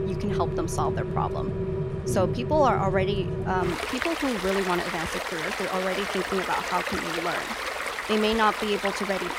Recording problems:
rain or running water; loud; throughout; 2 dB below the speech

